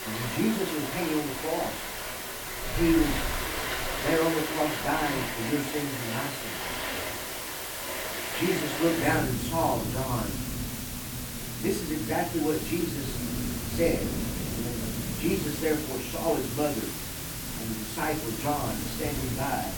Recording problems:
off-mic speech; far
room echo; slight; dies away in 0.3 s
rain or running water; loud; throughout; 5 dB below the speech
hiss; loud; throughout; 5 dB below the speech

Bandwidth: 18 kHz